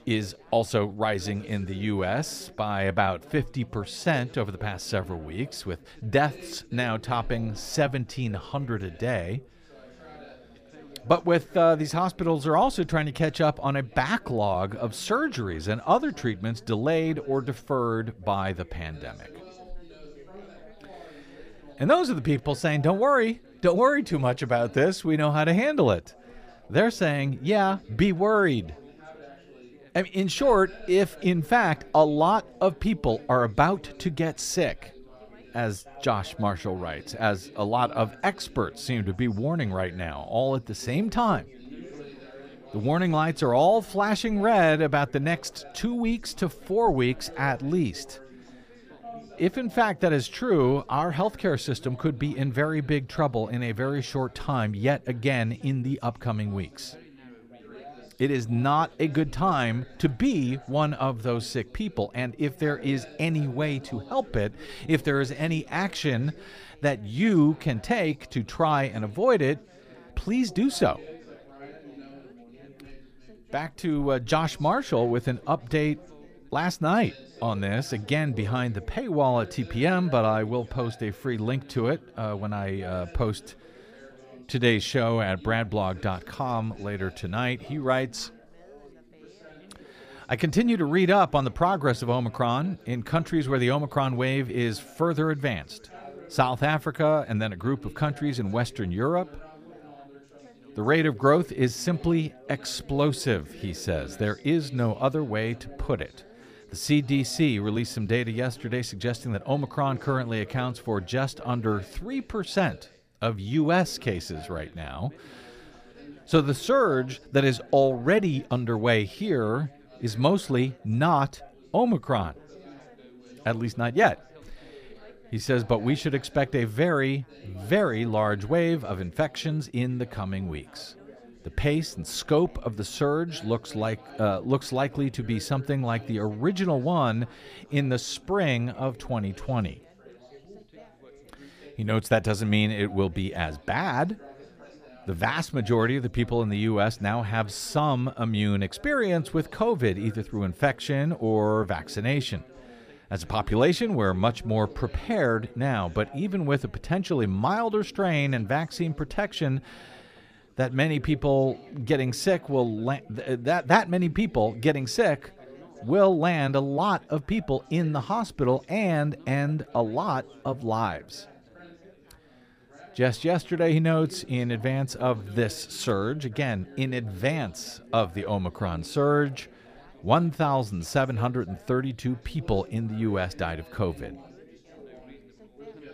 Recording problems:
background chatter; faint; throughout; 4 voices, 20 dB below the speech

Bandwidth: 15 kHz